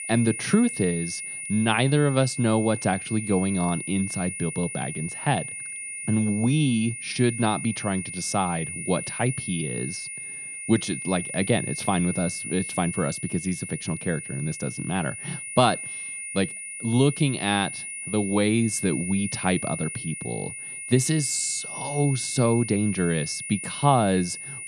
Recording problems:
high-pitched whine; loud; throughout; 9.5 kHz, 7 dB below the speech

